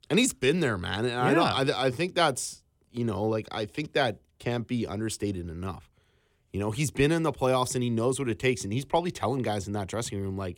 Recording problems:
none

